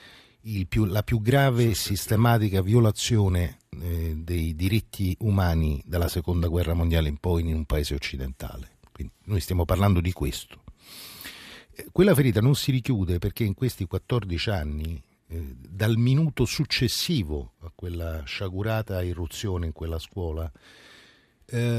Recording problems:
abrupt cut into speech; at the end

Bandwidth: 14.5 kHz